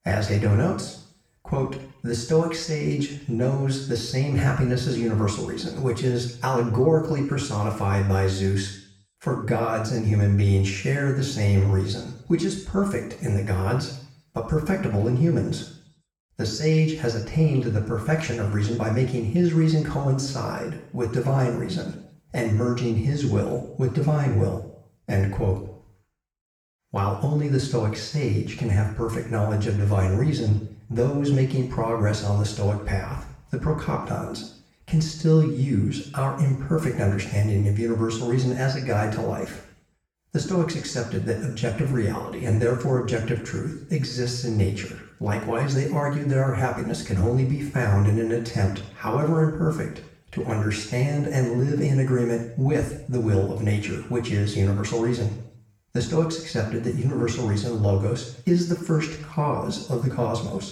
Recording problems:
off-mic speech; far
room echo; noticeable; dies away in 0.6 s

